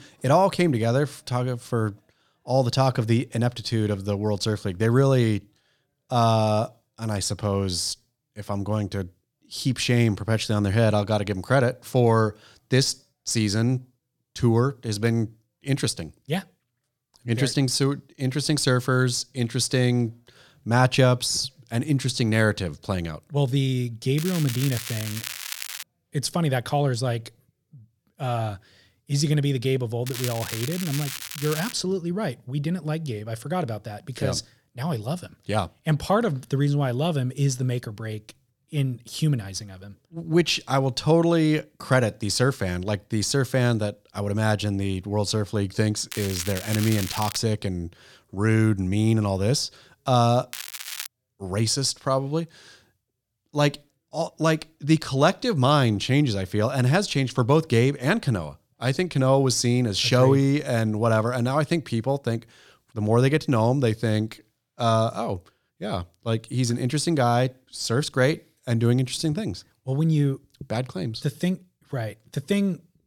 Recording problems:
crackling; loud; 4 times, first at 24 s; 9 dB below the speech

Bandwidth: 18 kHz